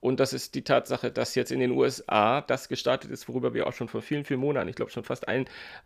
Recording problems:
none

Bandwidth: 15 kHz